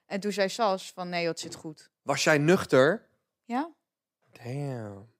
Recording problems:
none

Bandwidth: 15.5 kHz